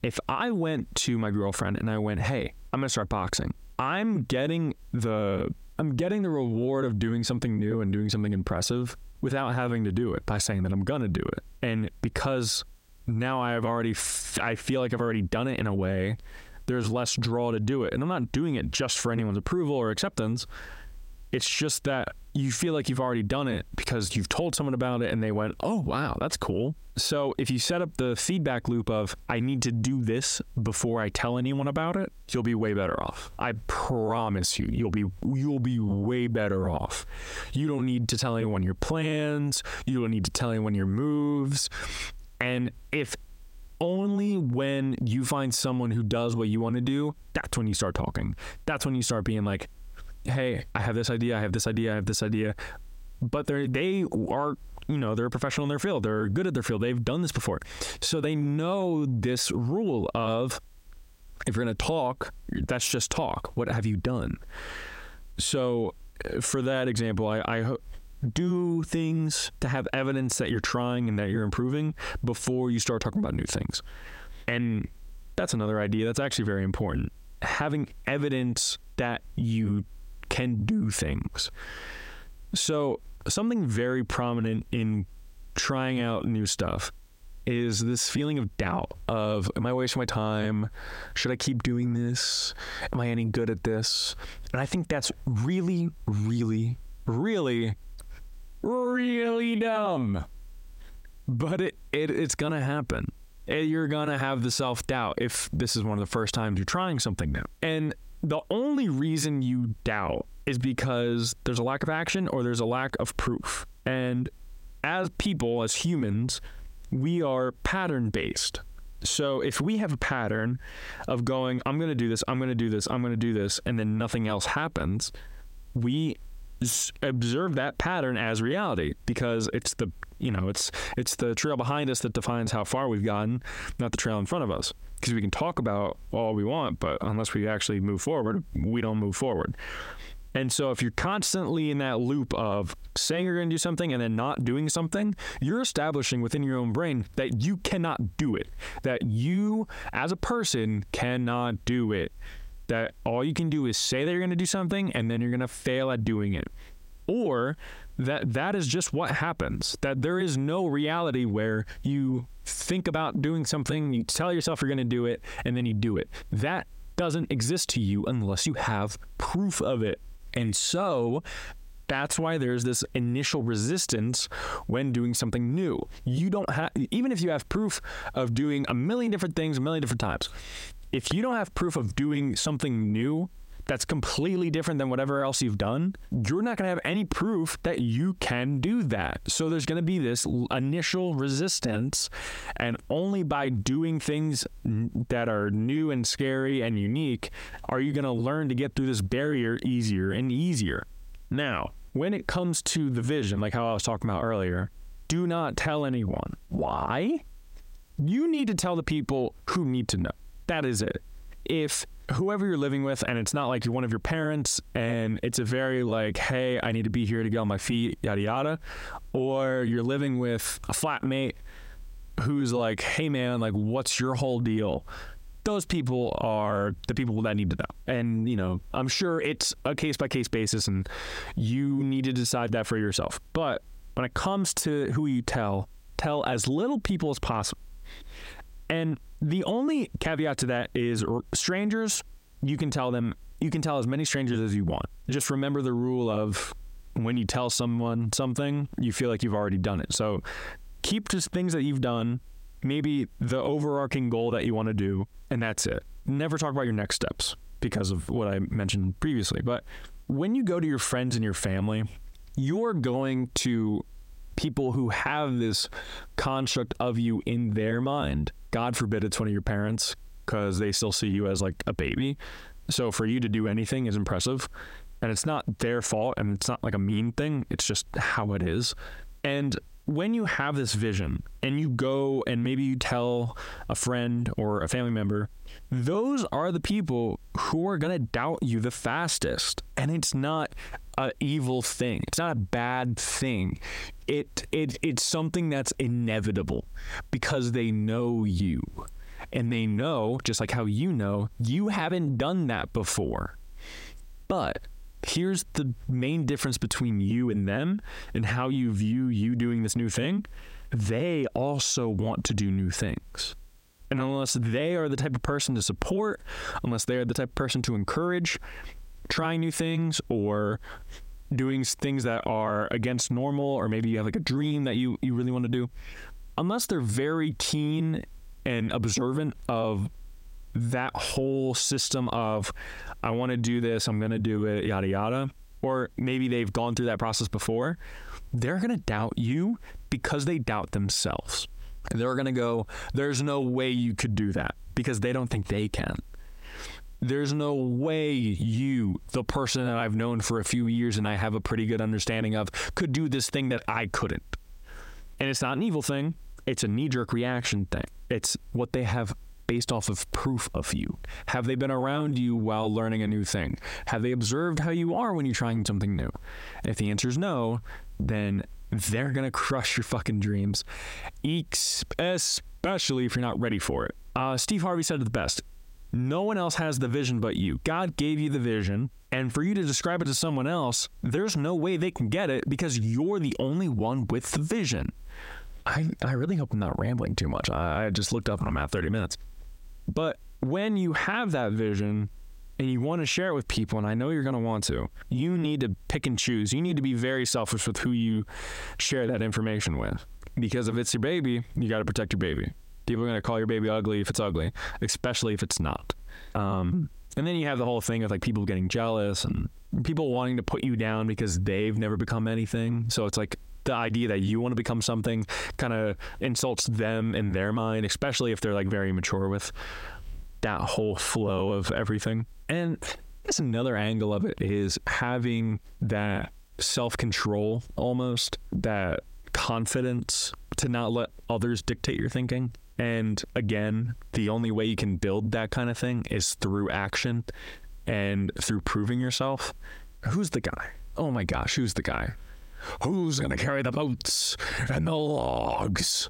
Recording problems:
squashed, flat; heavily

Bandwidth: 16 kHz